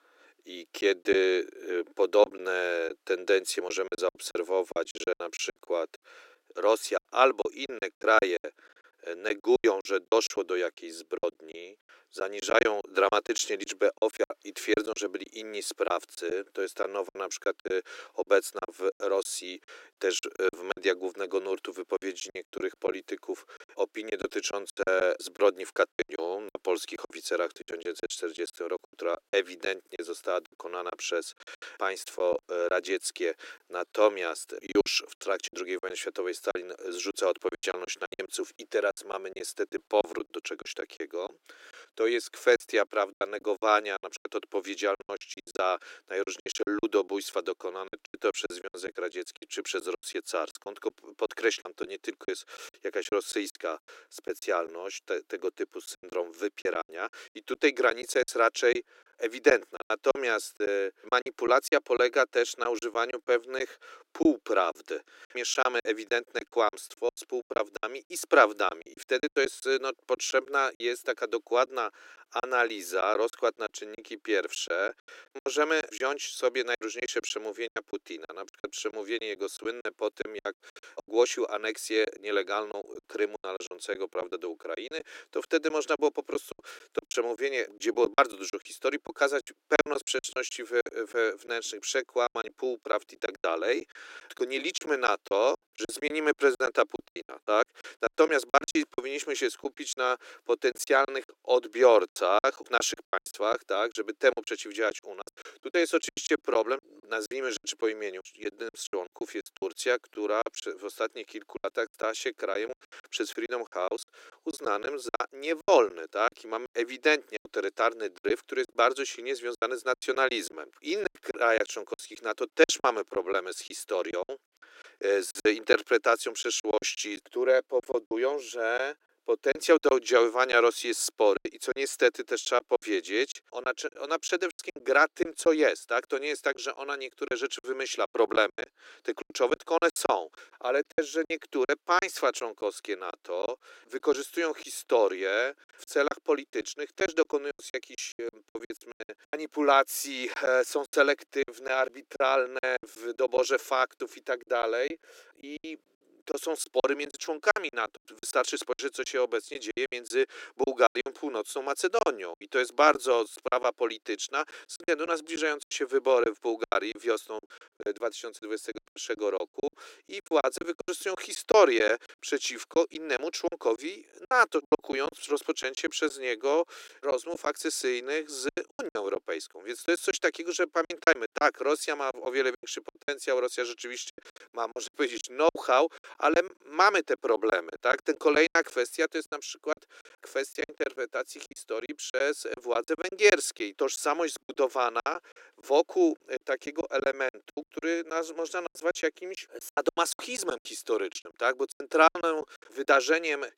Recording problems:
thin; very; fading below 300 Hz
choppy; very; 13% of the speech affected

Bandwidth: 16 kHz